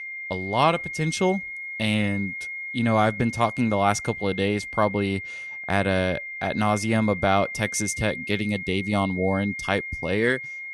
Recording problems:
high-pitched whine; loud; throughout; 2 kHz, 8 dB below the speech

